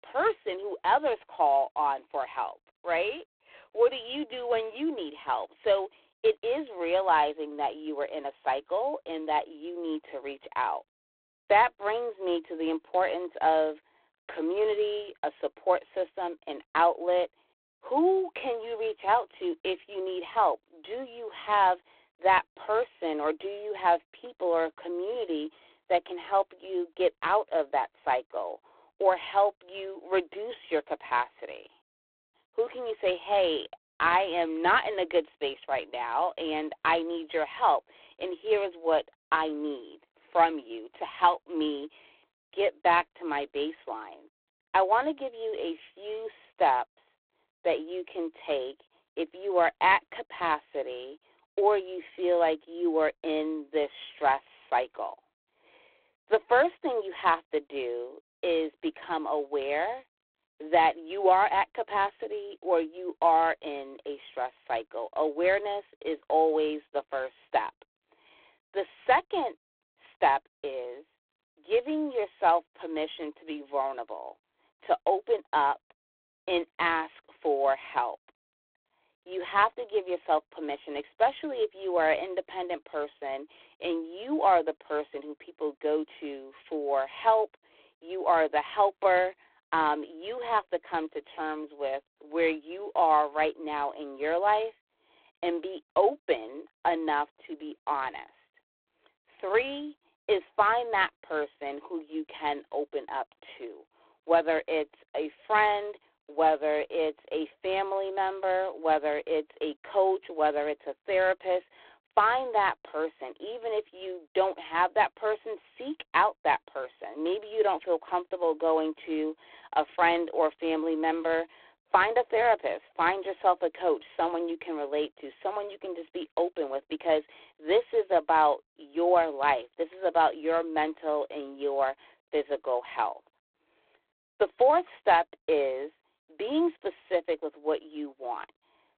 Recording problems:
phone-call audio; poor line; nothing above 3.5 kHz

